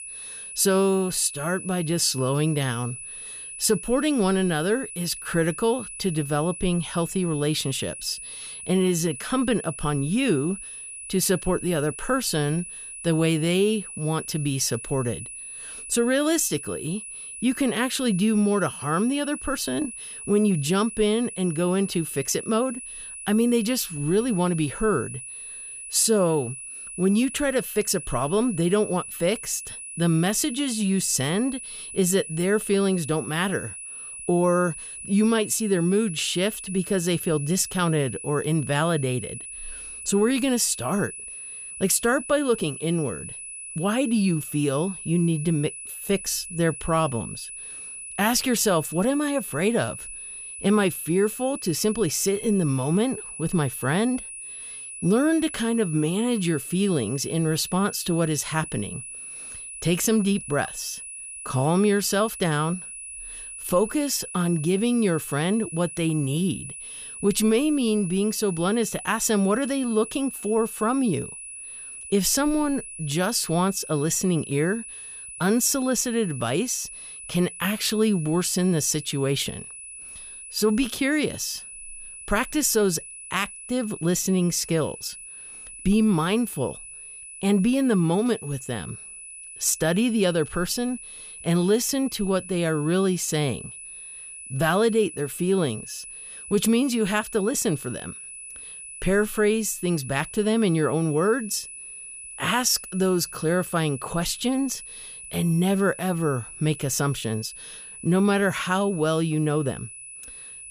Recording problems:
high-pitched whine; noticeable; throughout; 10 kHz, 10 dB below the speech

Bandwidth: 15 kHz